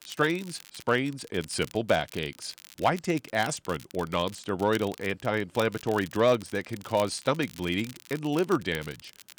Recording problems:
crackle, like an old record; noticeable; 20 dB below the speech

